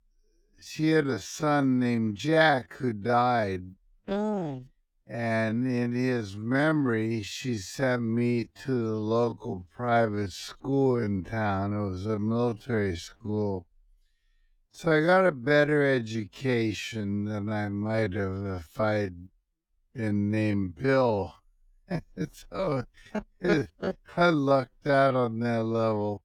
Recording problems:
wrong speed, natural pitch; too slow; 0.5 times normal speed

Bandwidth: 18.5 kHz